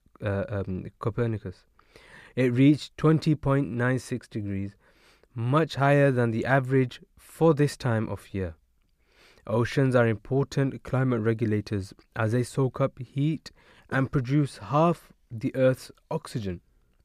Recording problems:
none

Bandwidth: 15 kHz